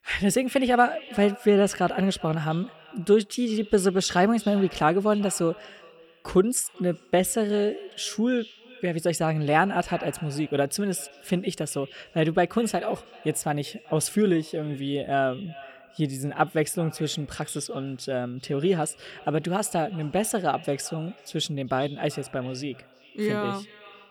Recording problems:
echo of what is said; faint; throughout; 380 ms later, 20 dB below the speech

